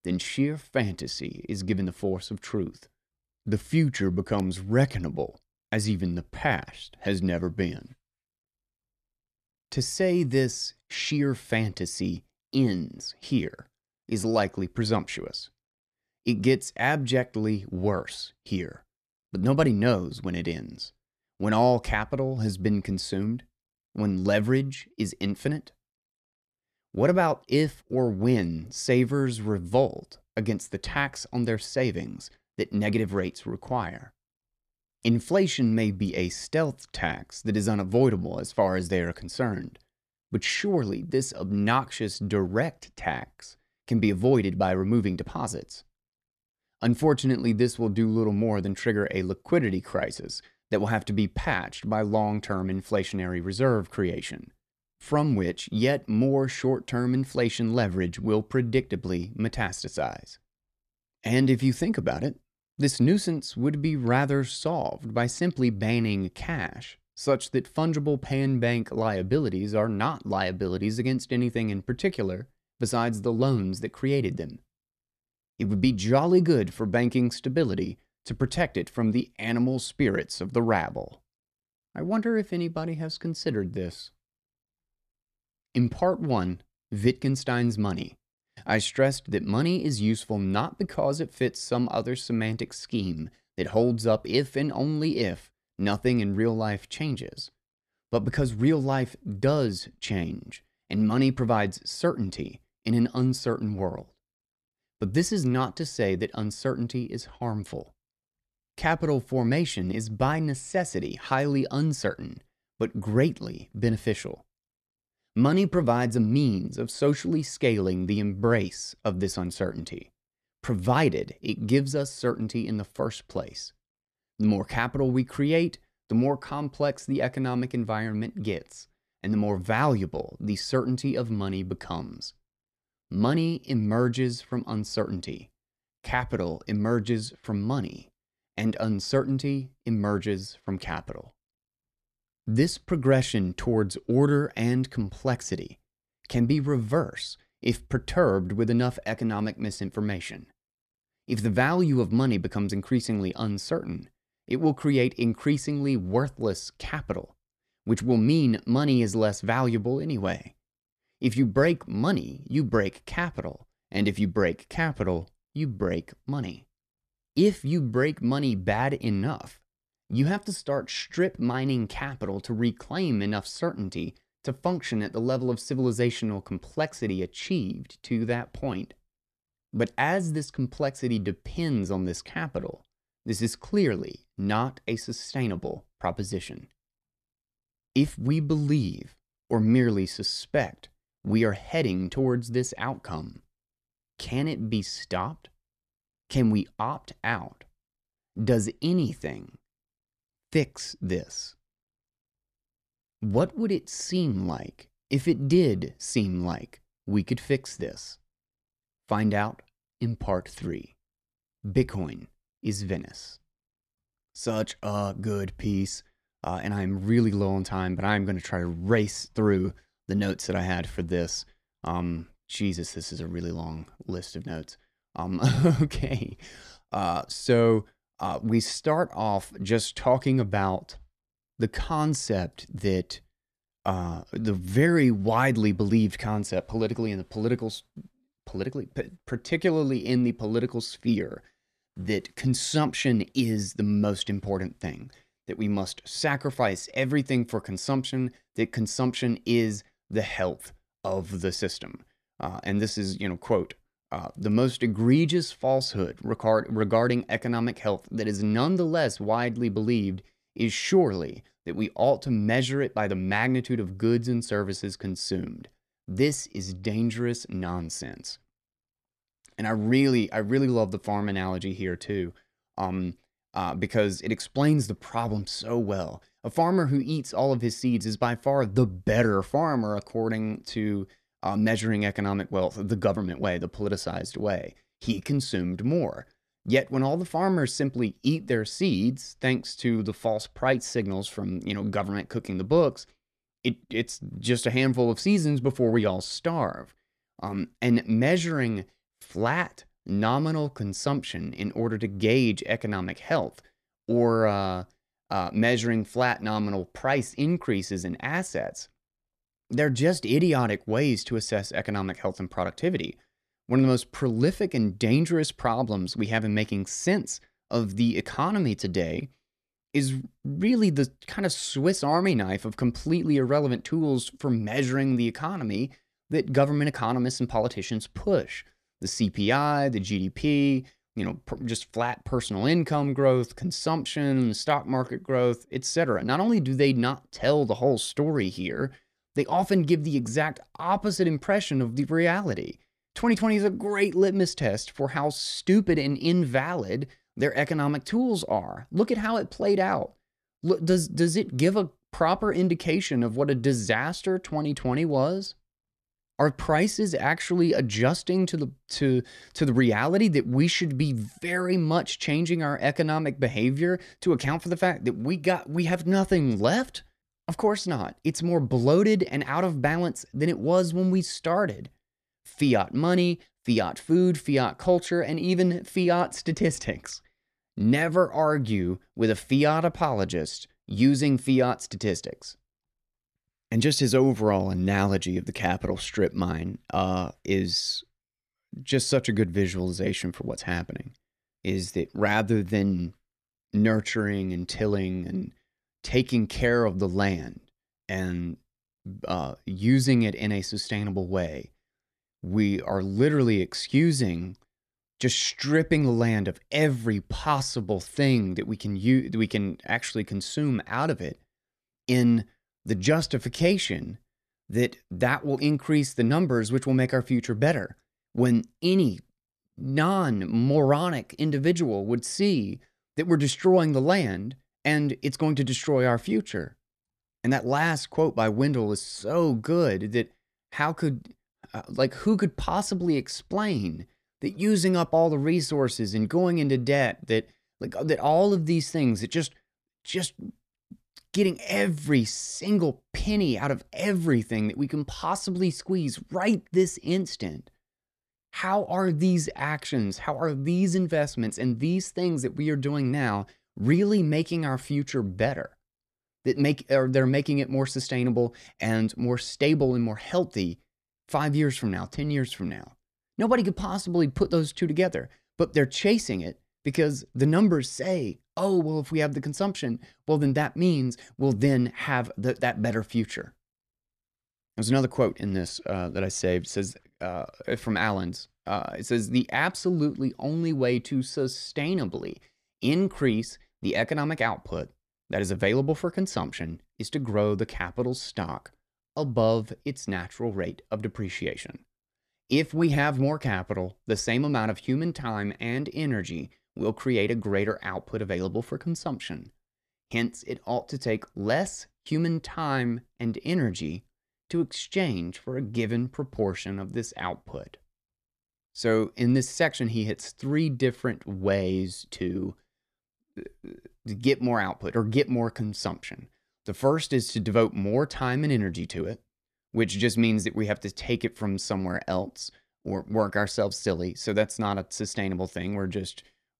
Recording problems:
none

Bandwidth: 14 kHz